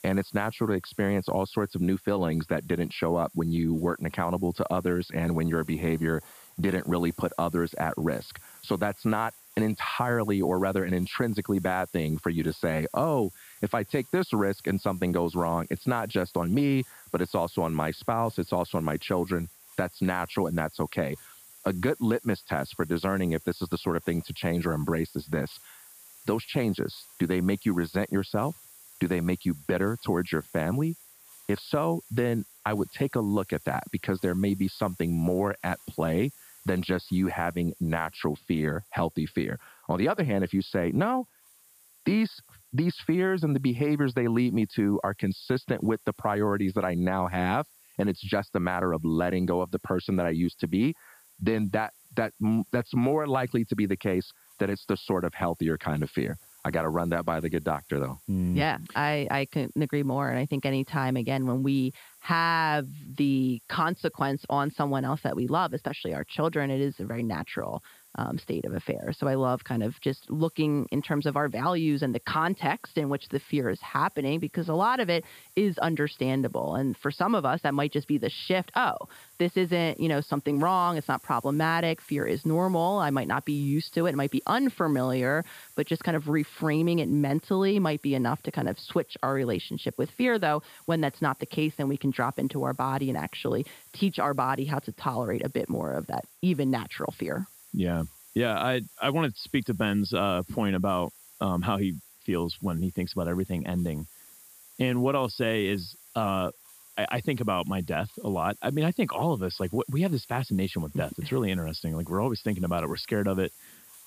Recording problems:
high frequencies cut off; noticeable; nothing above 5 kHz
hiss; faint; throughout; 20 dB below the speech

